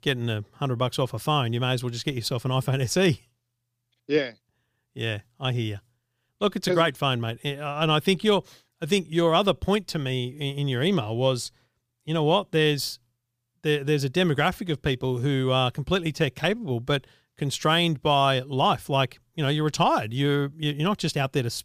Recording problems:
none

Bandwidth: 15 kHz